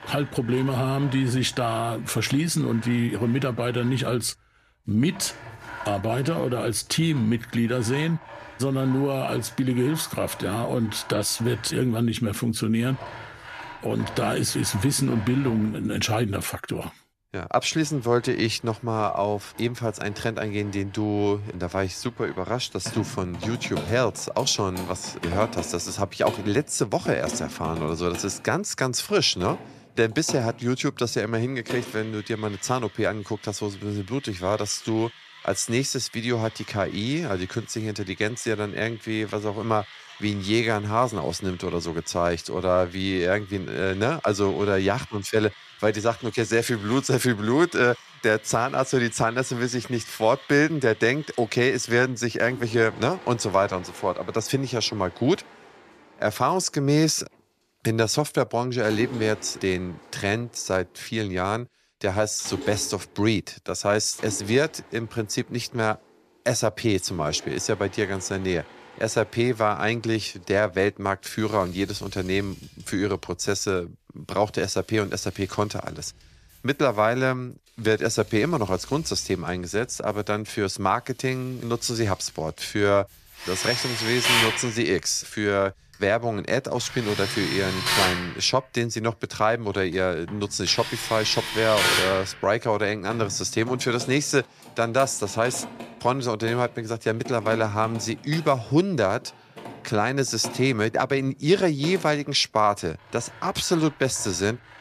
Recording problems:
machinery noise; loud; throughout; 10 dB below the speech

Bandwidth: 14.5 kHz